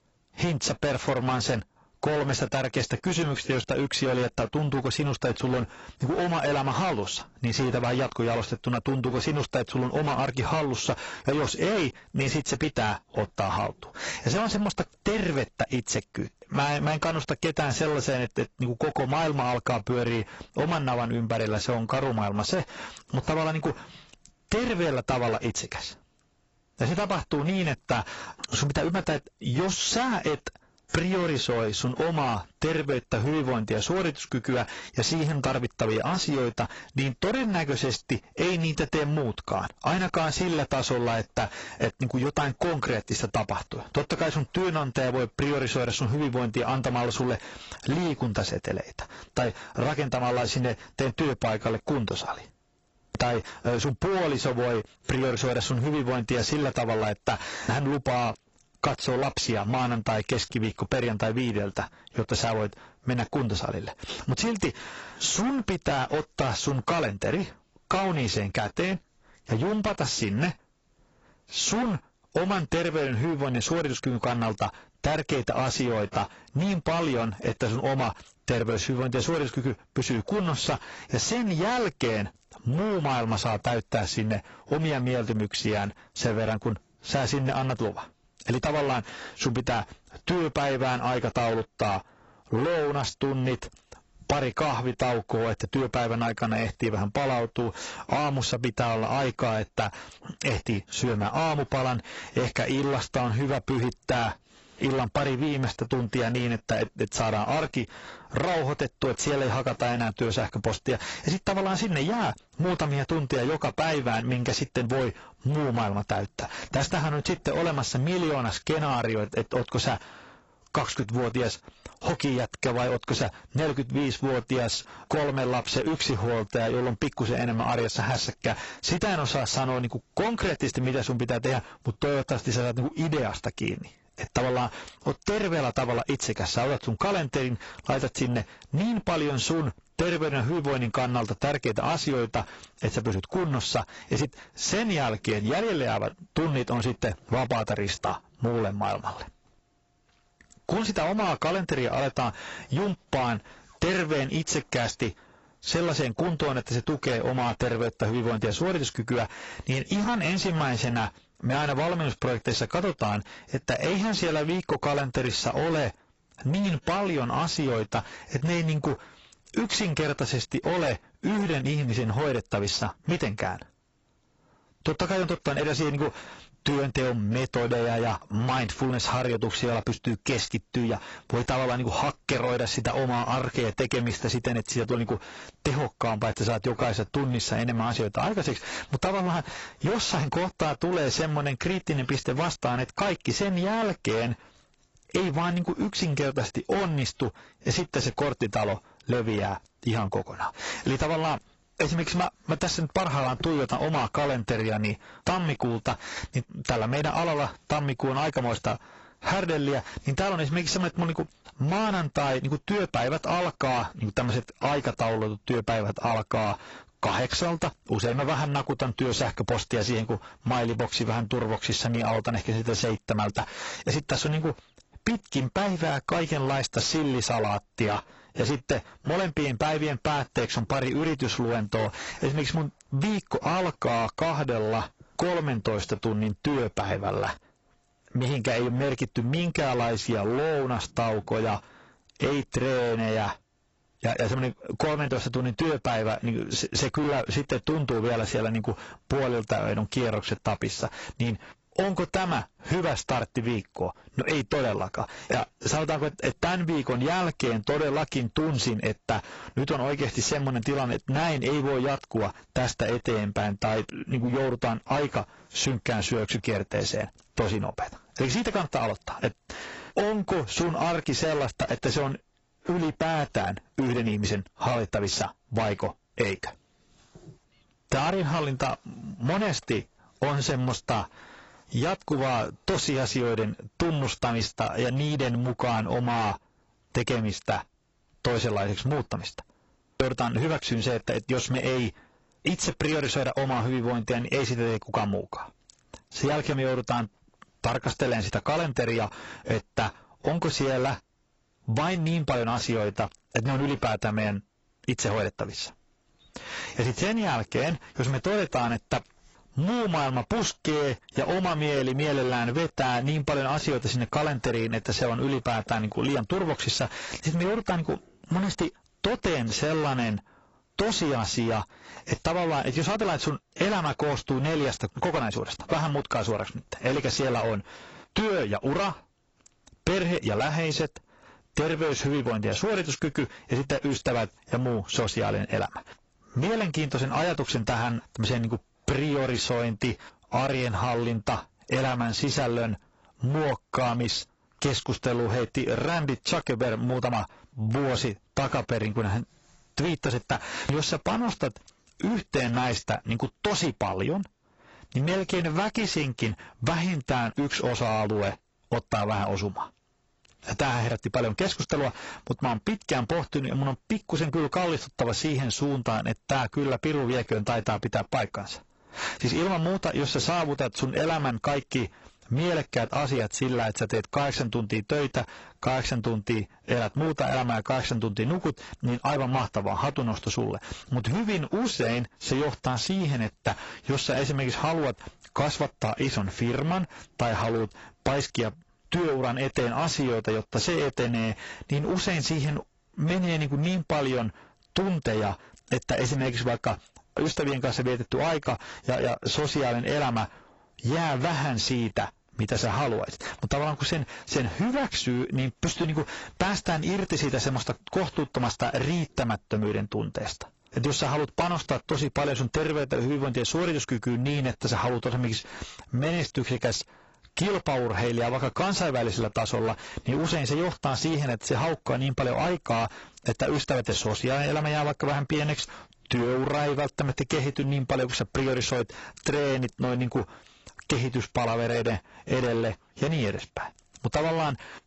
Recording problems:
distortion; heavy; 20% of the sound clipped
garbled, watery; badly; nothing above 7.5 kHz
squashed, flat; somewhat

